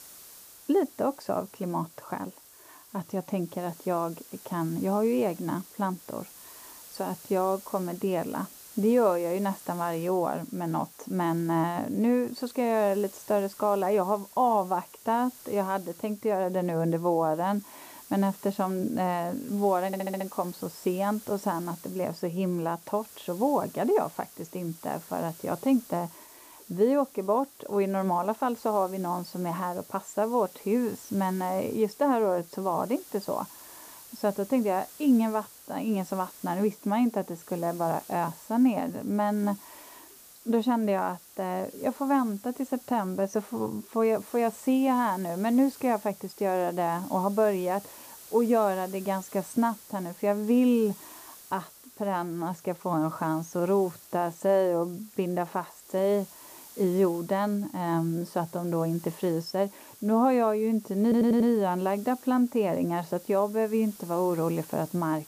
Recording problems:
muffled; slightly; fading above 1.5 kHz
hiss; noticeable; throughout; 20 dB below the speech
audio stuttering; at 20 s and at 1:01

